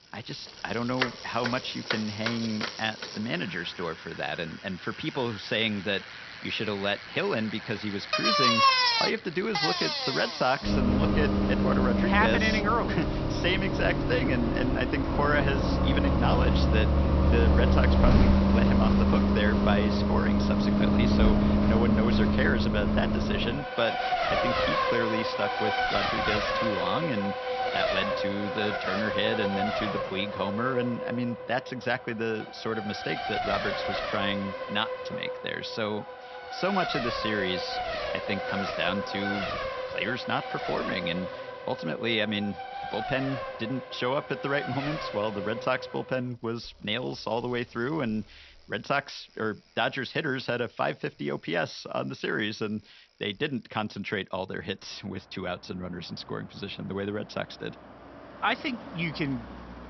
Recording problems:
high frequencies cut off; noticeable; nothing above 5.5 kHz
traffic noise; very loud; throughout; 3 dB above the speech

